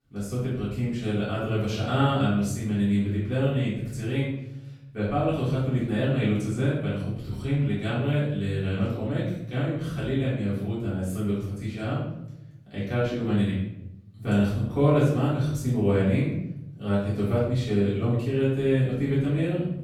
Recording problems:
off-mic speech; far
room echo; noticeable; dies away in 0.8 s

